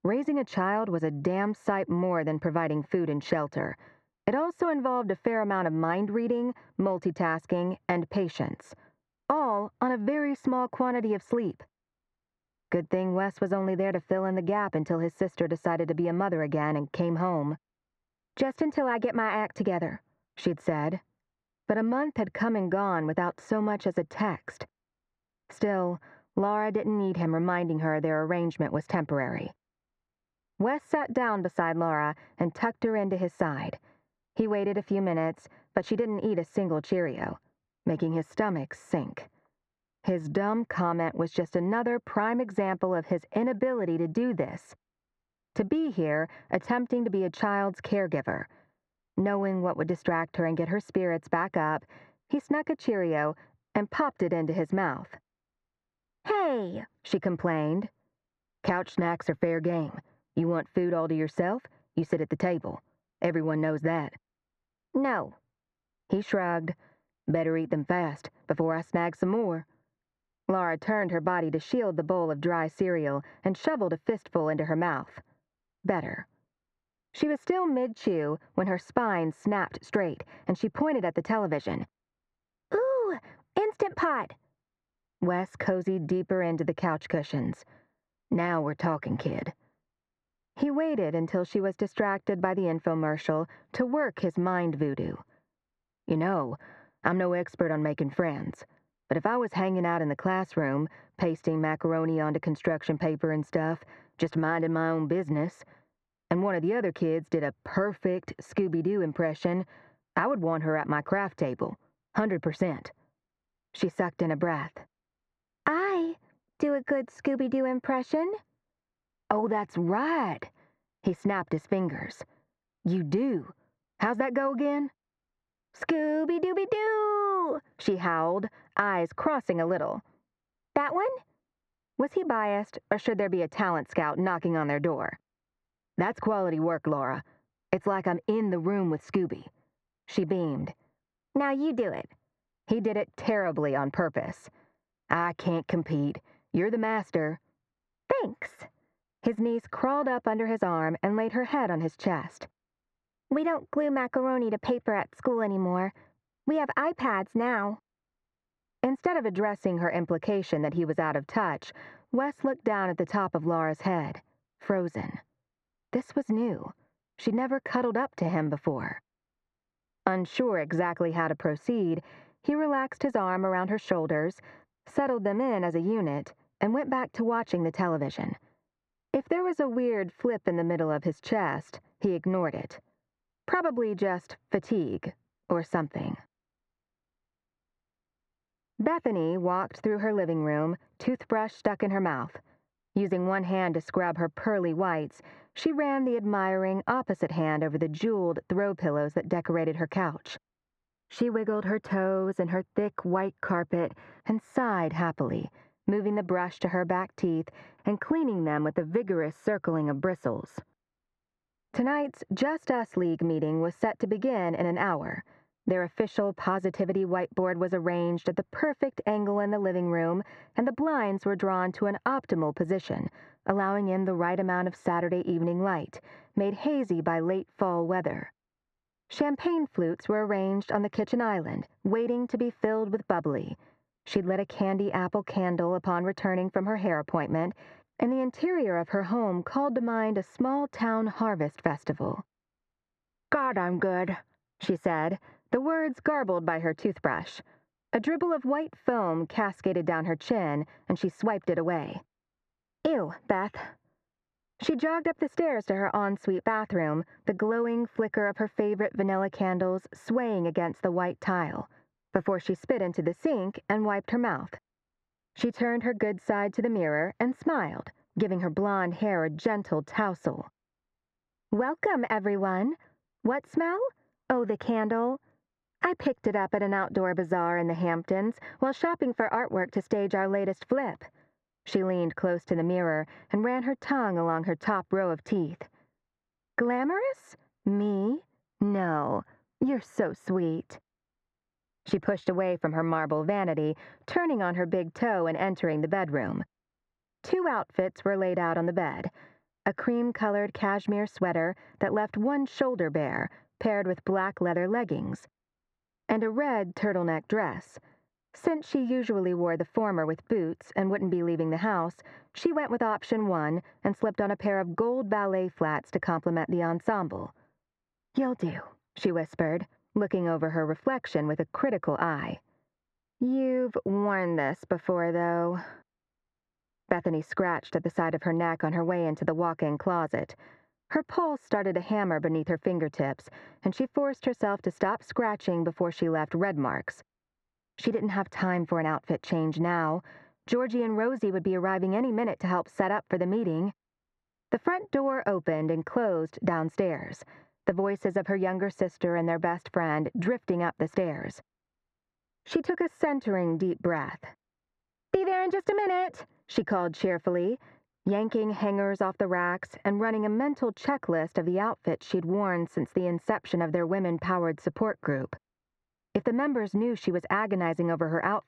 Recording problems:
muffled; slightly; fading above 1.5 kHz
squashed, flat; somewhat

